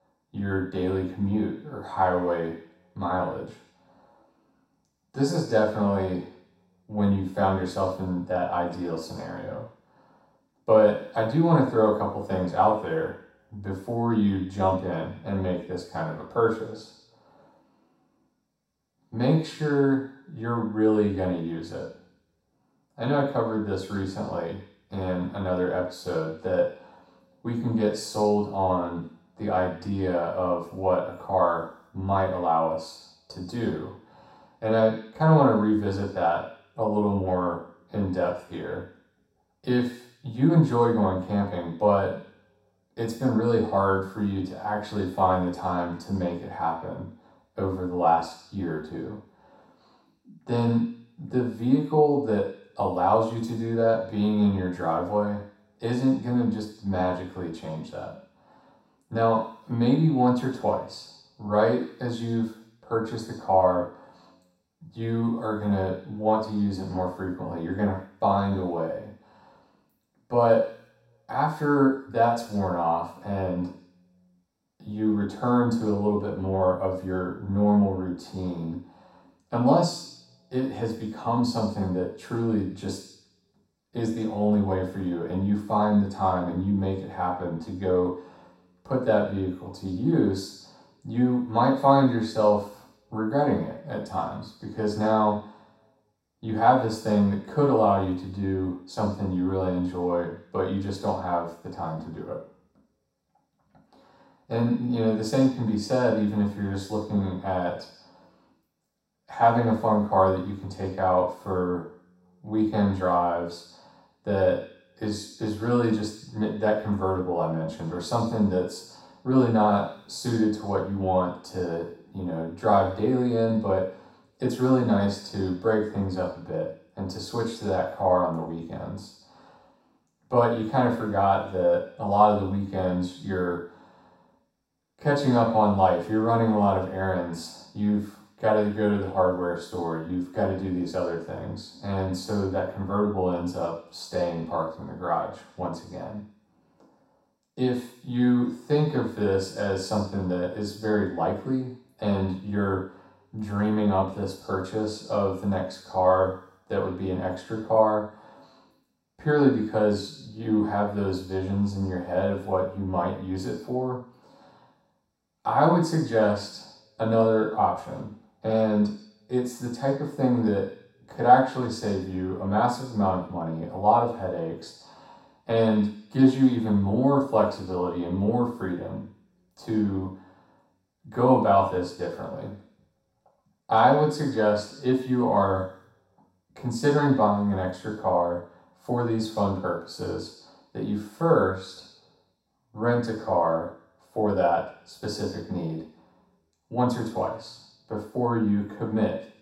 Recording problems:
off-mic speech; far
room echo; noticeable; dies away in 0.7 s

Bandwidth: 16 kHz